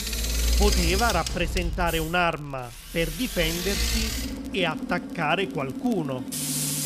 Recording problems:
machinery noise; loud; throughout; 1 dB below the speech
crackle, like an old record; faint; 25 dB below the speech

